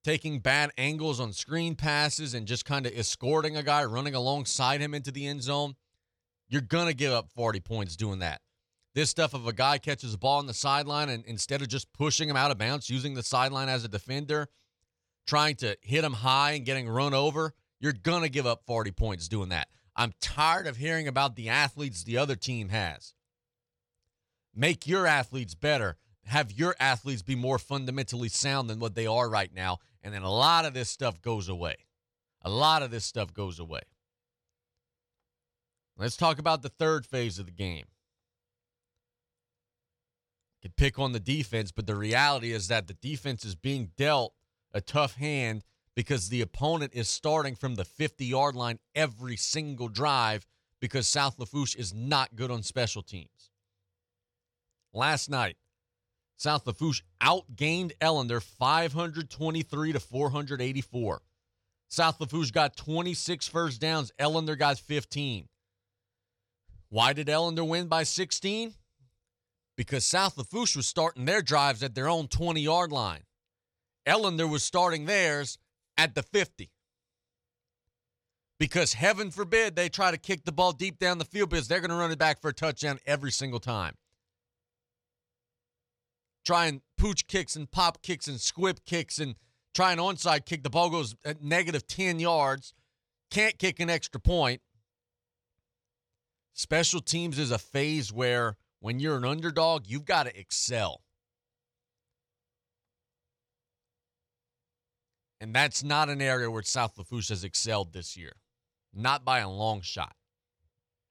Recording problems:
none

